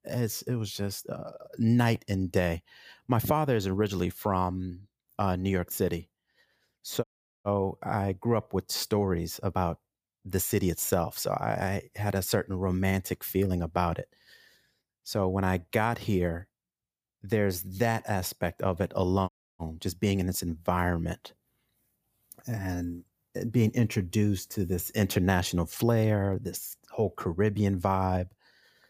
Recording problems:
audio cutting out; at 7 s and at 19 s

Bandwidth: 15 kHz